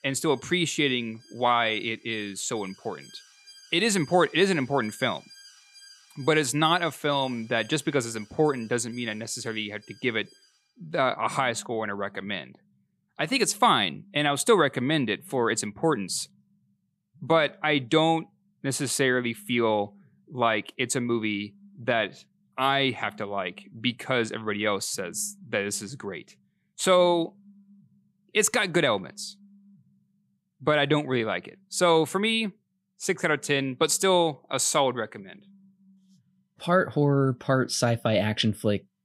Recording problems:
alarms or sirens; faint; throughout; 25 dB below the speech

